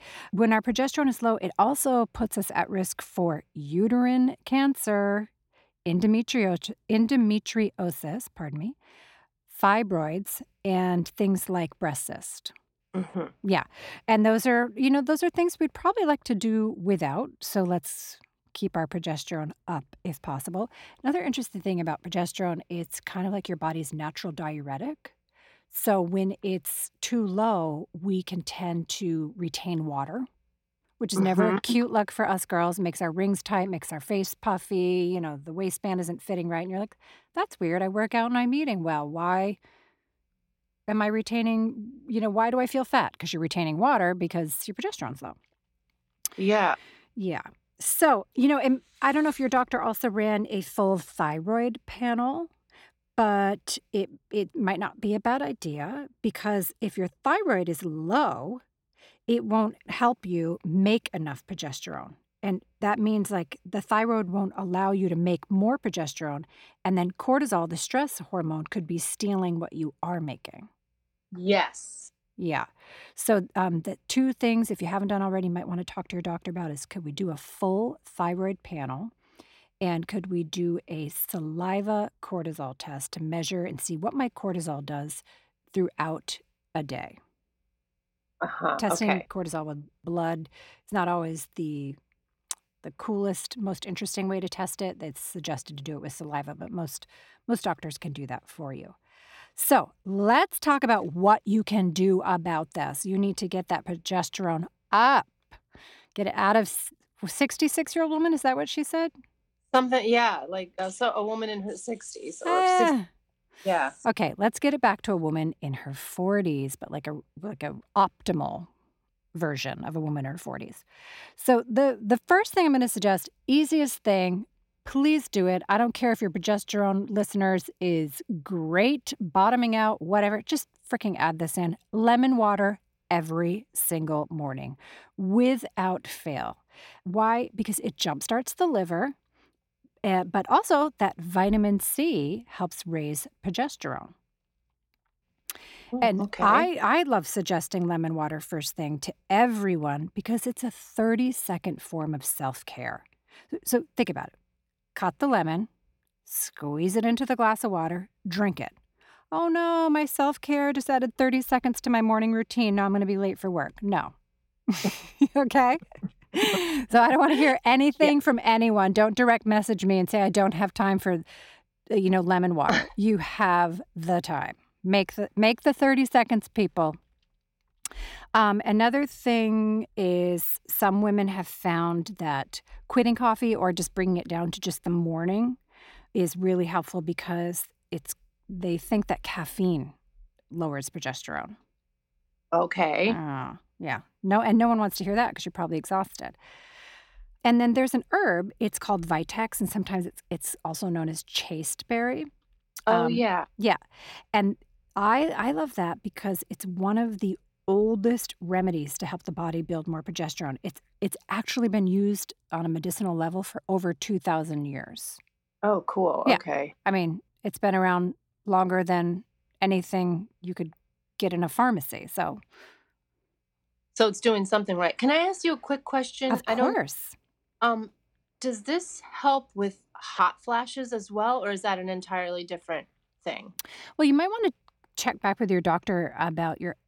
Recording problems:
none

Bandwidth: 16.5 kHz